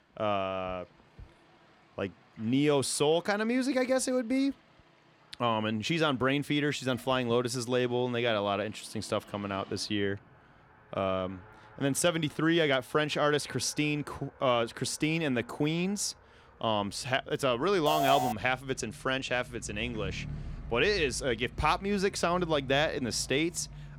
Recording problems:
traffic noise; faint; throughout; 20 dB below the speech
alarm; loud; at 18 s; peak level with the speech

